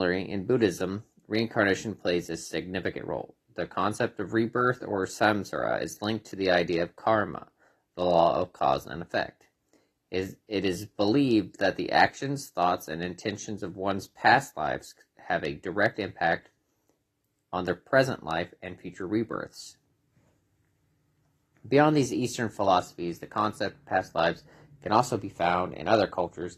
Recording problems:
garbled, watery; slightly; nothing above 13.5 kHz
abrupt cut into speech; at the start

